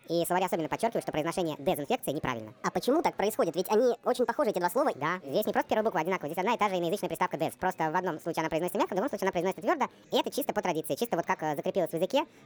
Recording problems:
wrong speed and pitch; too fast and too high; 1.6 times normal speed
chatter from many people; faint; throughout; 30 dB below the speech

